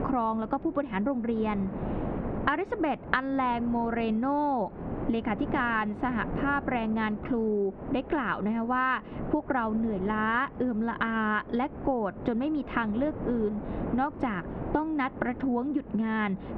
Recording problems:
muffled; very; fading above 2.5 kHz
squashed, flat; somewhat
wind noise on the microphone; occasional gusts; 15 dB below the speech

